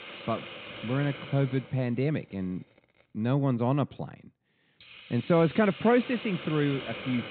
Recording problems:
high frequencies cut off; severe; nothing above 4 kHz
hiss; noticeable; throughout; 15 dB below the speech

